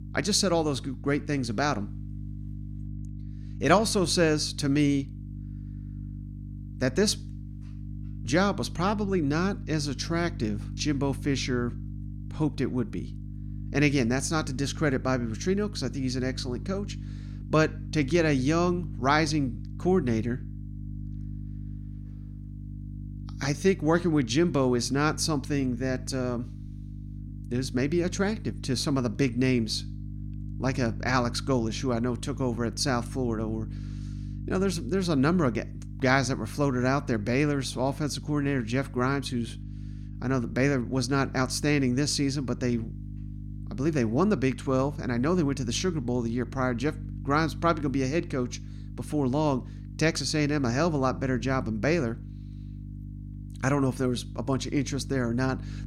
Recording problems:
electrical hum; faint; throughout; 50 Hz, 20 dB below the speech

